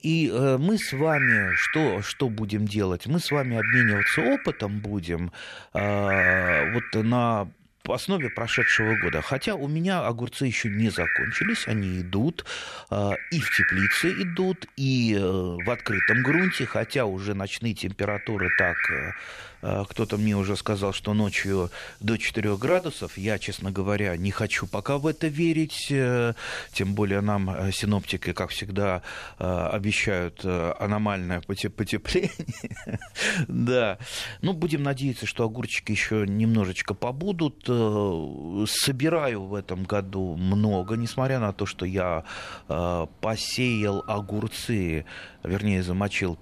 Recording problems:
animal sounds; very loud; throughout; 1 dB above the speech

